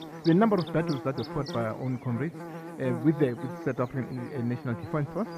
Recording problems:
muffled; very; fading above 2 kHz
electrical hum; loud; throughout; 50 Hz, 9 dB below the speech

